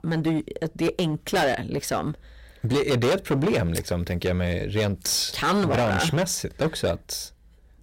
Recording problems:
distortion; heavy; 14% of the sound clipped

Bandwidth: 16 kHz